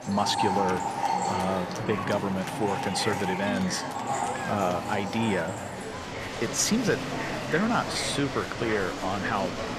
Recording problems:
echo of what is said; faint; throughout; 370 ms later, 25 dB below the speech
rain or running water; loud; throughout; 5 dB below the speech
murmuring crowd; loud; throughout; 5 dB below the speech

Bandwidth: 14.5 kHz